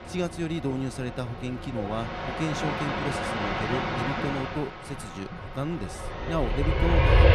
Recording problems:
train or aircraft noise; very loud; throughout; 3 dB above the speech

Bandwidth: 15 kHz